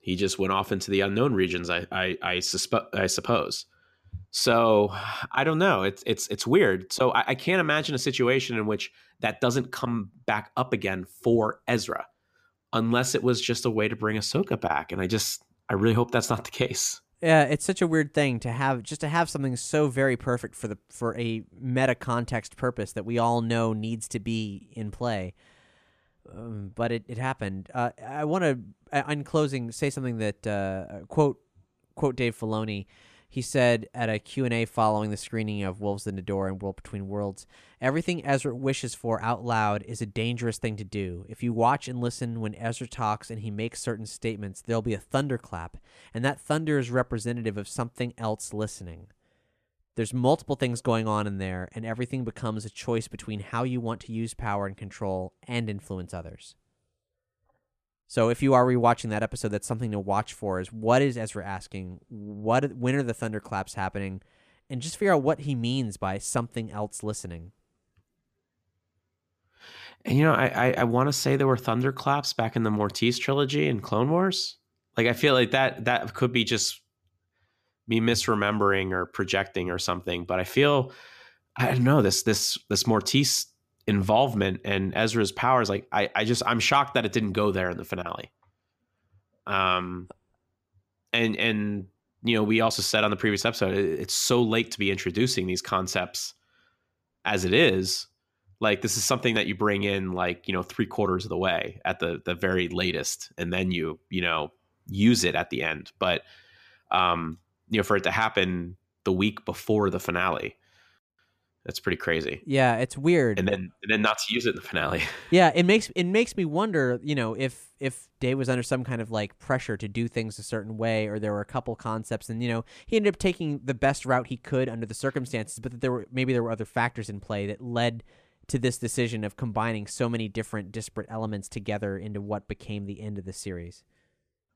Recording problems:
none

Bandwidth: 14.5 kHz